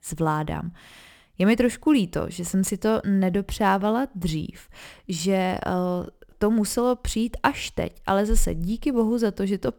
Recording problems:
none

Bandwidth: 18.5 kHz